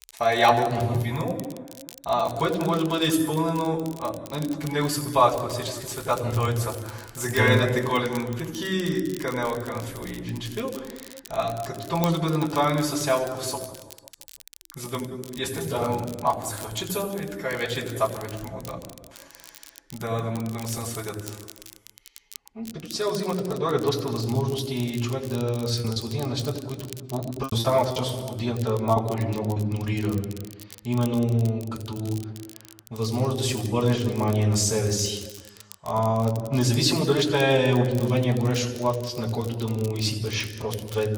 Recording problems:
off-mic speech; far
room echo; noticeable; dies away in 1.1 s
garbled, watery; slightly; nothing above 13 kHz
crackle, like an old record; noticeable; 20 dB below the speech
choppy; very; from 26 to 30 s; 9% of the speech affected

